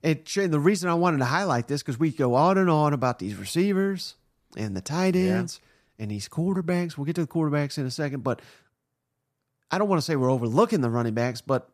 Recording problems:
none

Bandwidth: 14.5 kHz